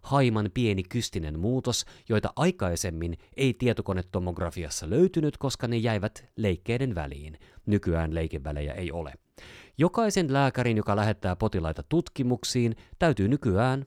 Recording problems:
none

